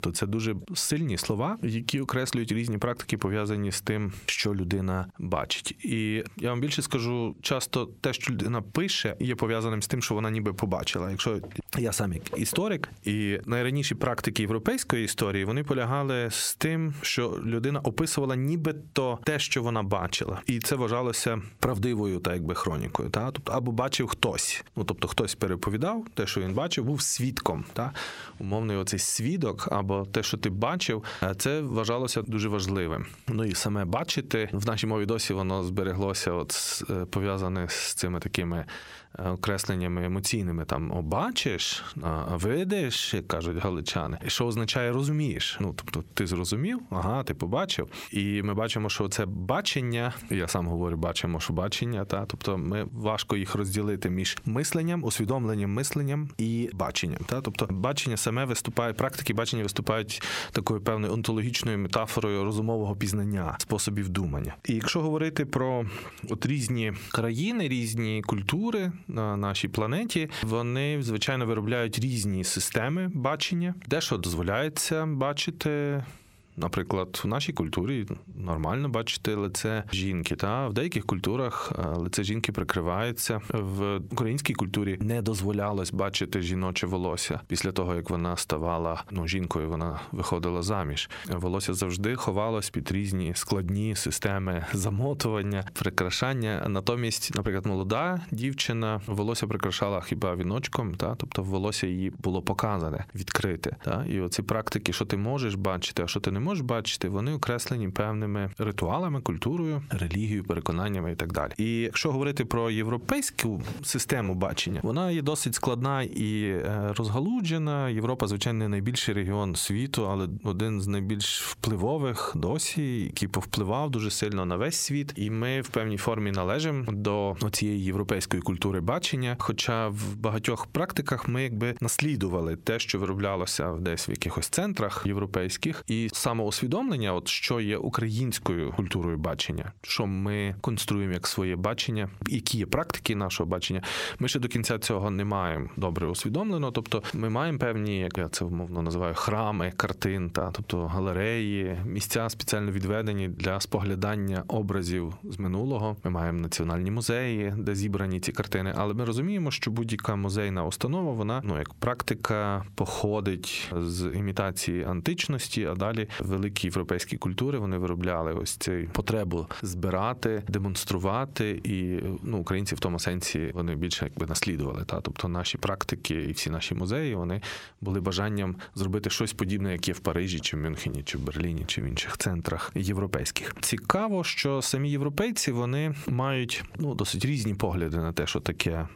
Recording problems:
squashed, flat; heavily

